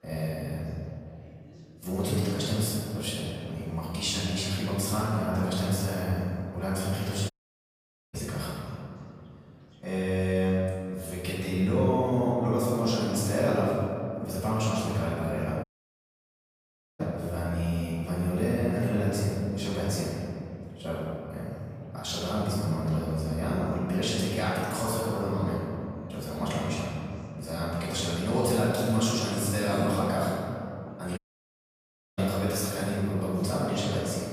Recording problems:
room echo; strong; dies away in 2.5 s
off-mic speech; far
chatter from many people; faint; throughout; 30 dB below the speech
audio cutting out; at 7.5 s for 1 s, at 16 s for 1.5 s and at 31 s for 1 s

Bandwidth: 15 kHz